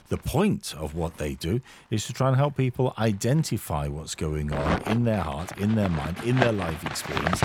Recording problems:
household noises; loud; throughout; 5 dB below the speech

